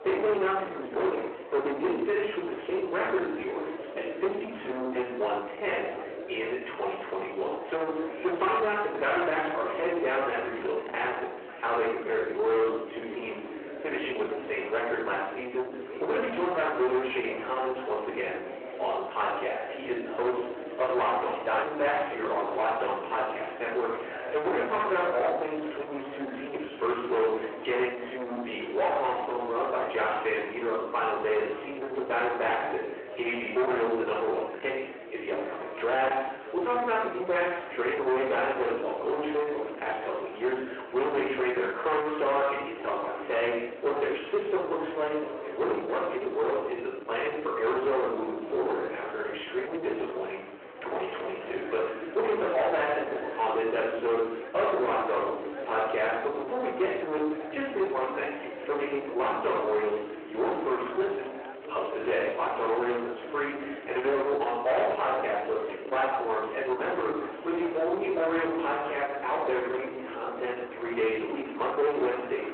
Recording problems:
distortion; heavy; 7 dB below the speech
off-mic speech; far
room echo; noticeable; dies away in 0.6 s
phone-call audio
chatter from many people; noticeable; throughout; 10 dB below the speech

